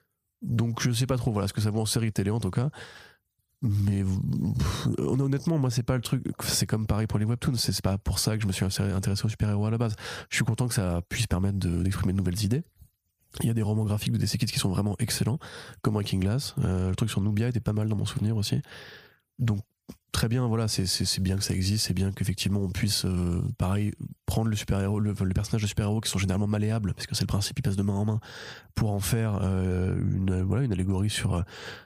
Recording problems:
squashed, flat; somewhat

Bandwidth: 15 kHz